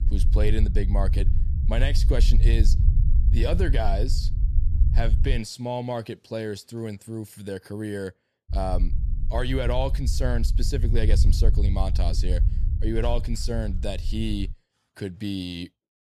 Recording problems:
low rumble; noticeable; until 5.5 s and from 8.5 to 15 s; 10 dB below the speech

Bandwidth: 14.5 kHz